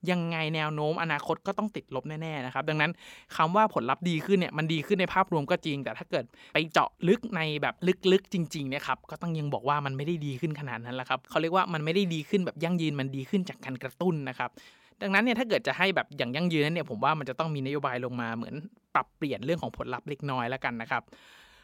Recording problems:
none

